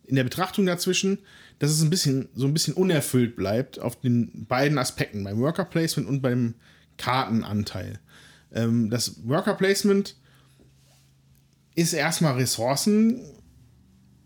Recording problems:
none

